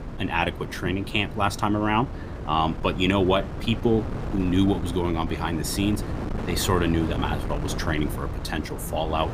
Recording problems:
wind noise on the microphone; occasional gusts; 10 dB below the speech

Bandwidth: 15 kHz